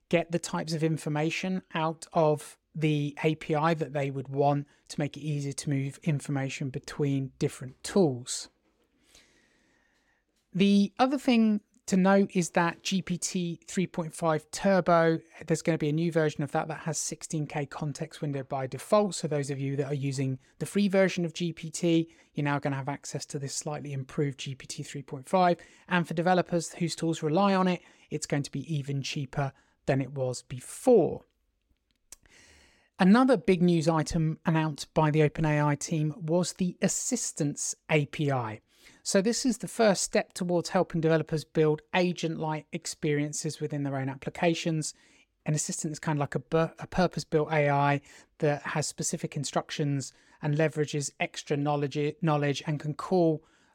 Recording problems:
none

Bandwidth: 17 kHz